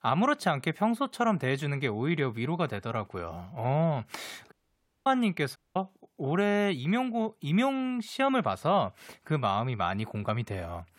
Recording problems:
audio cutting out; at 4.5 s for 0.5 s and at 5.5 s

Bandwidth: 16 kHz